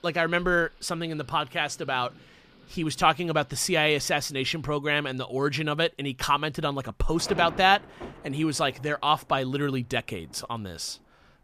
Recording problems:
rain or running water; faint; throughout; 20 dB below the speech

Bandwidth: 14.5 kHz